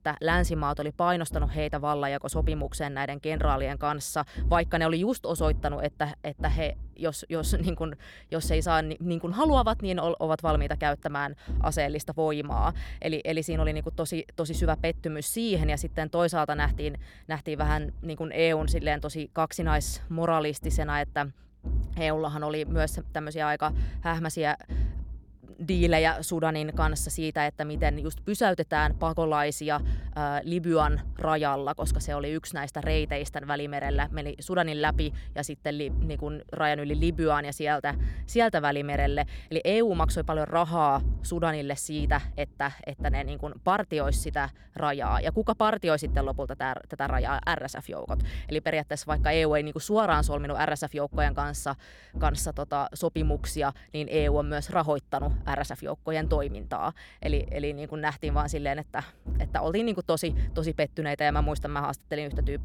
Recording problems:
low rumble; faint; throughout; 20 dB below the speech

